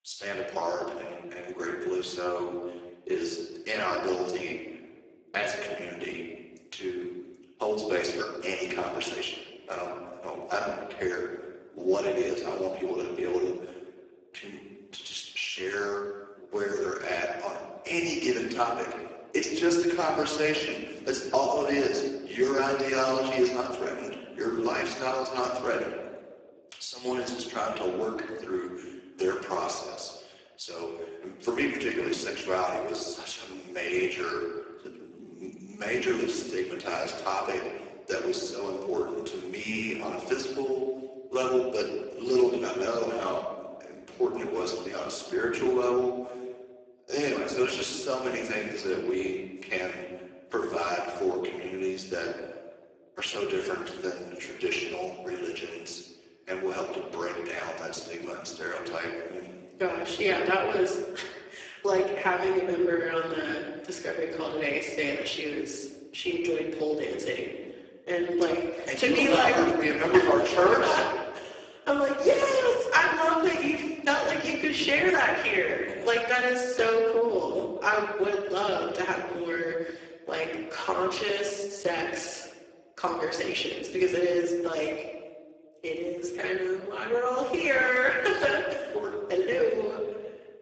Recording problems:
garbled, watery; badly; nothing above 7.5 kHz
room echo; noticeable; dies away in 1.1 s
thin; somewhat; fading below 300 Hz
off-mic speech; somewhat distant

